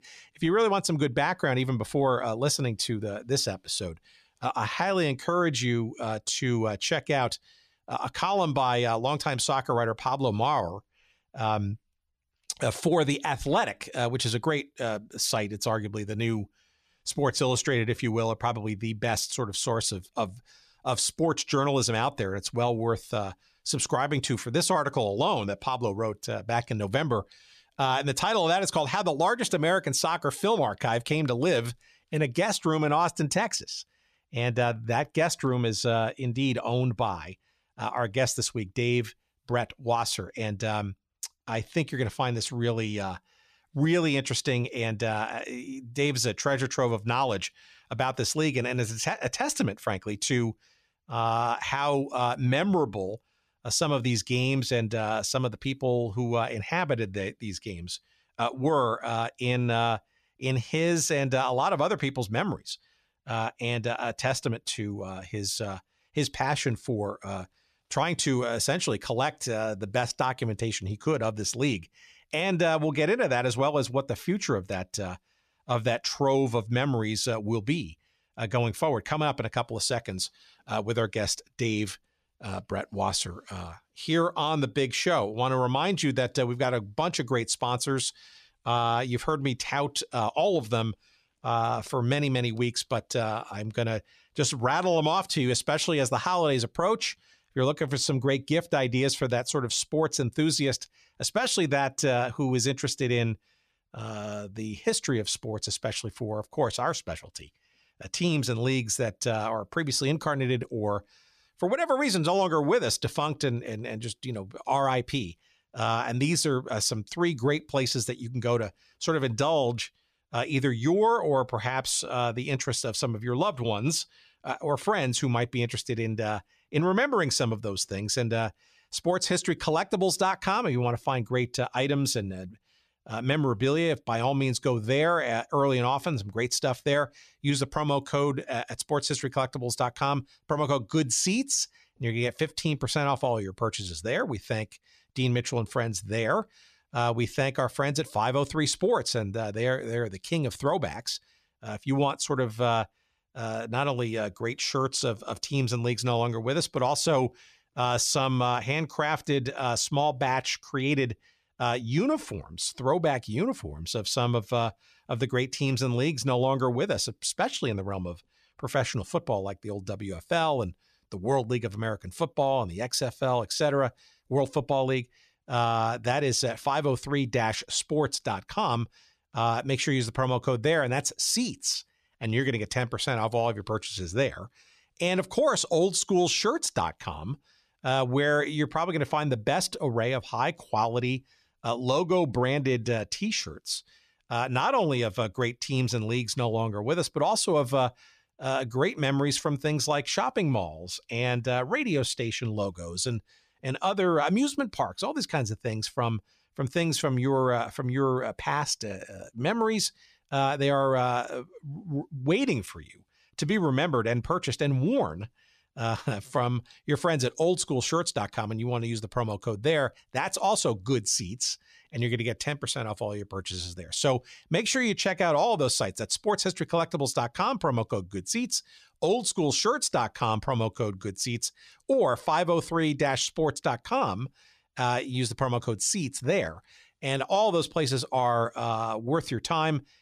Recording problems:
none

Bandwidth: 14 kHz